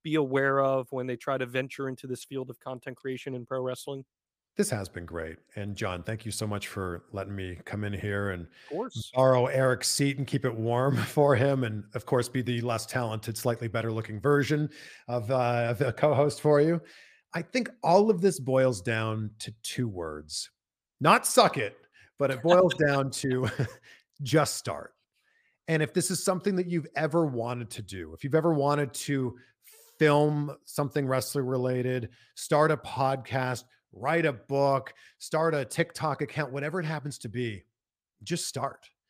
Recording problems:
none

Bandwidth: 15 kHz